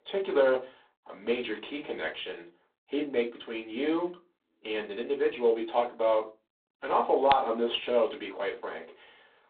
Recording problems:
phone-call audio; poor line; nothing above 3.5 kHz
off-mic speech; far
room echo; very slight; dies away in 0.2 s

